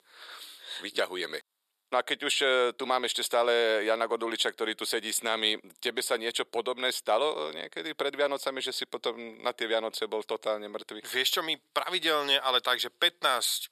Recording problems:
thin; very; fading below 500 Hz

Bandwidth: 13.5 kHz